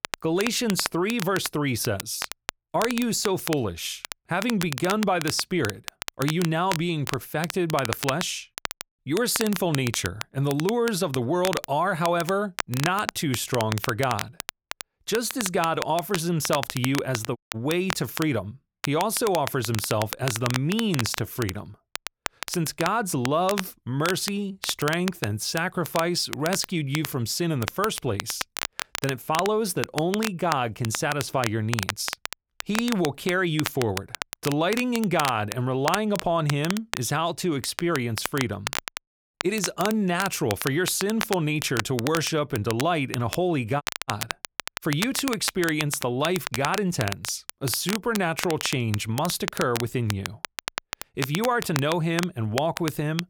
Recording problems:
crackle, like an old record; loud; 8 dB below the speech
audio cutting out; at 17 s and at 44 s

